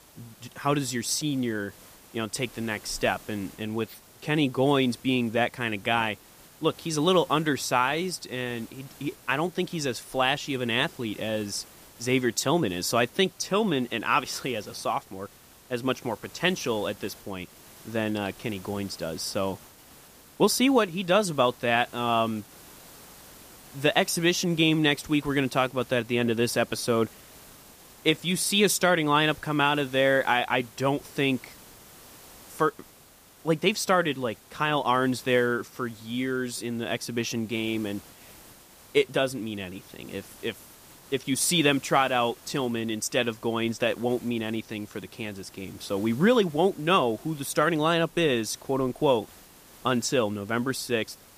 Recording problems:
hiss; faint; throughout; 25 dB below the speech

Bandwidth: 15 kHz